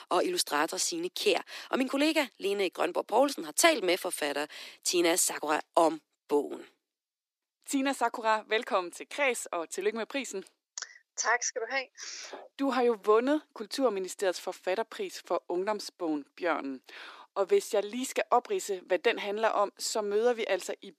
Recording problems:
thin; somewhat; fading below 300 Hz

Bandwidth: 14.5 kHz